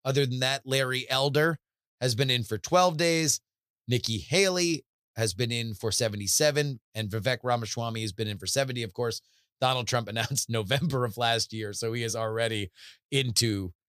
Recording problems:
none

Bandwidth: 15 kHz